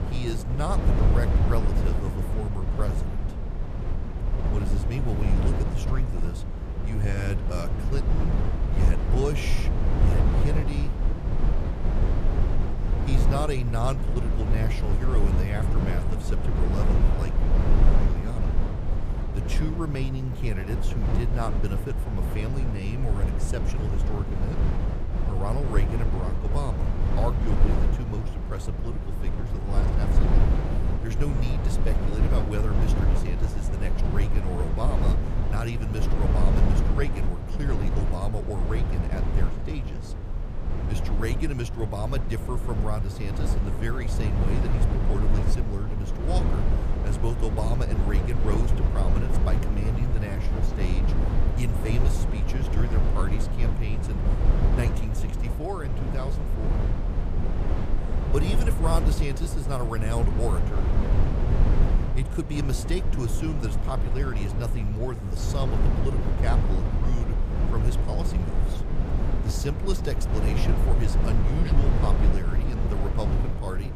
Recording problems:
low rumble; loud; throughout; as loud as the speech

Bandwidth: 14.5 kHz